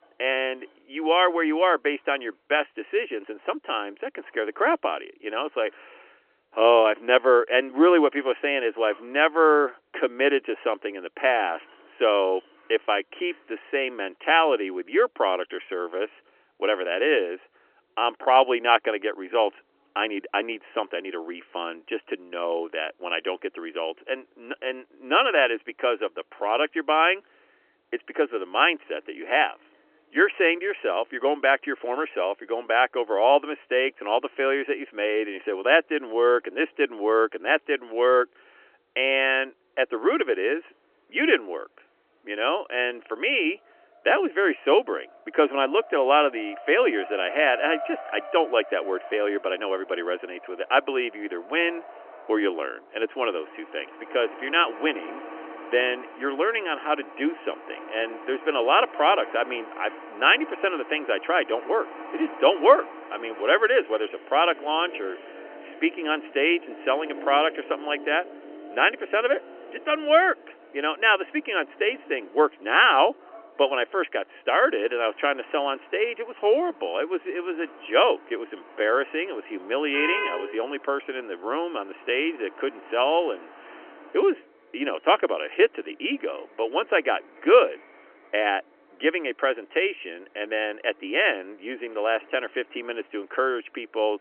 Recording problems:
phone-call audio; nothing above 3 kHz
traffic noise; noticeable; throughout; 15 dB below the speech

